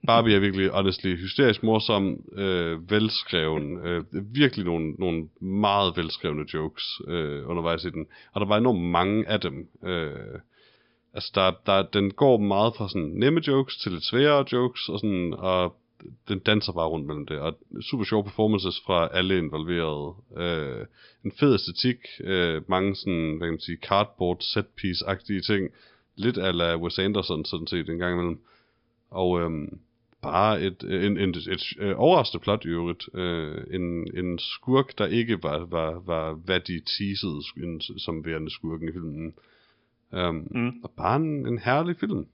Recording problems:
high frequencies cut off; noticeable; nothing above 5 kHz

